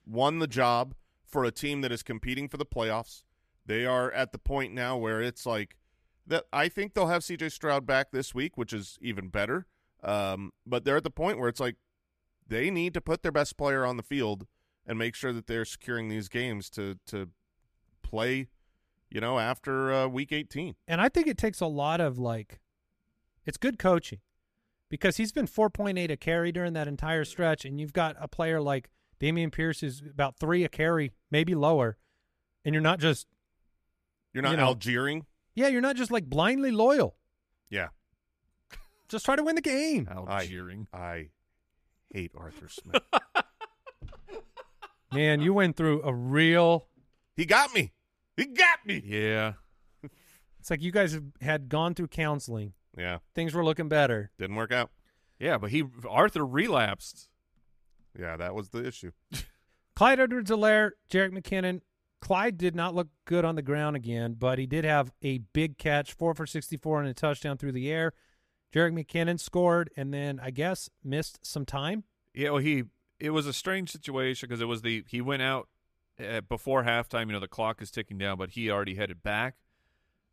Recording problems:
none

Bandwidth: 14.5 kHz